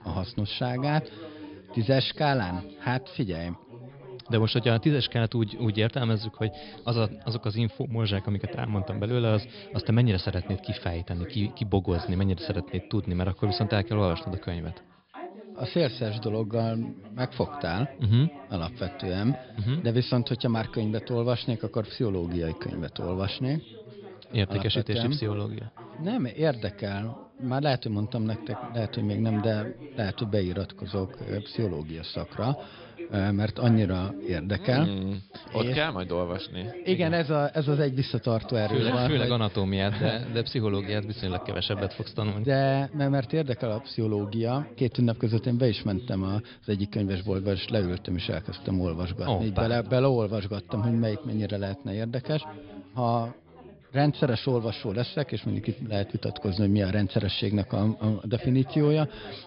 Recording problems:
high frequencies cut off; noticeable; nothing above 5 kHz
background chatter; noticeable; throughout; 3 voices, 15 dB below the speech

